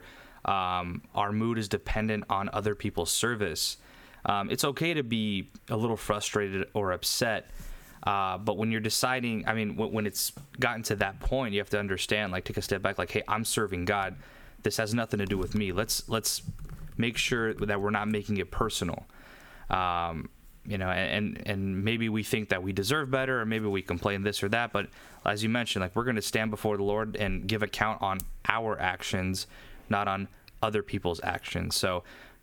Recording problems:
squashed, flat; somewhat

